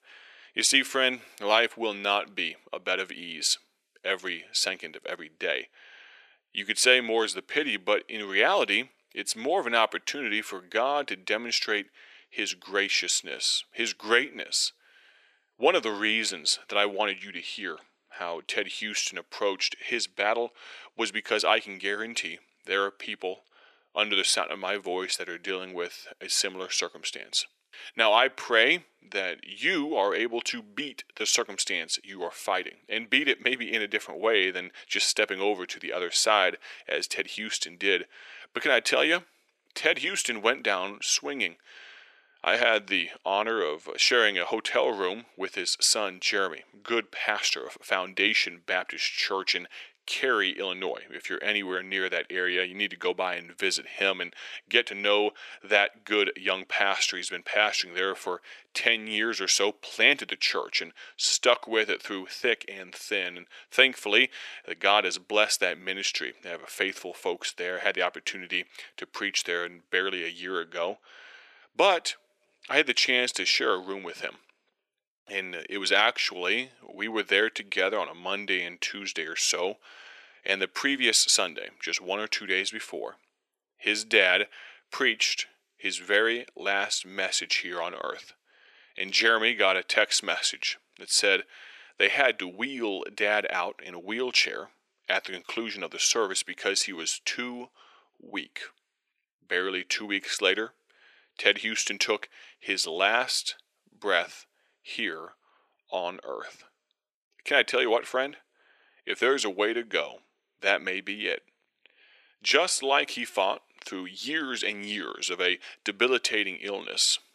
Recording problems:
thin; very; fading below 400 Hz

